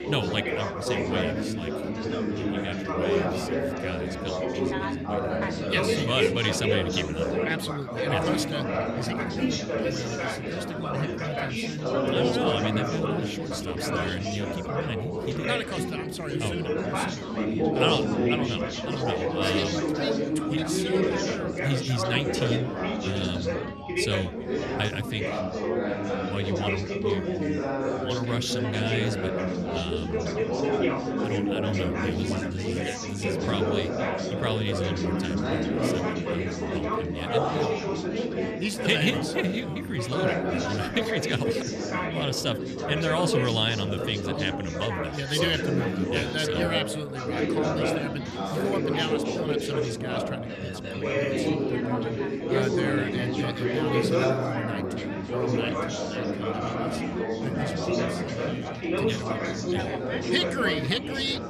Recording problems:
chatter from many people; very loud; throughout; 3 dB above the speech

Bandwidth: 14 kHz